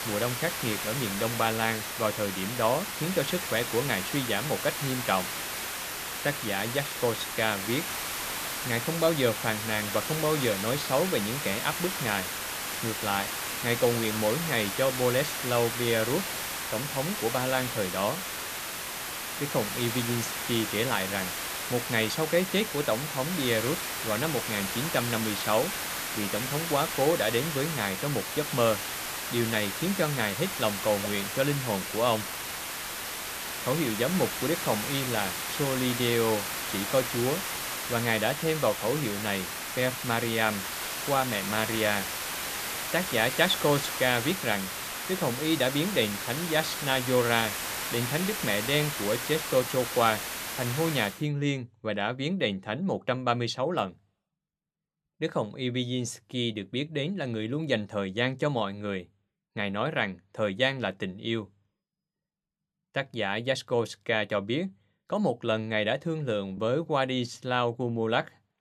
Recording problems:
hiss; loud; until 51 s; 3 dB below the speech

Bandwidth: 14.5 kHz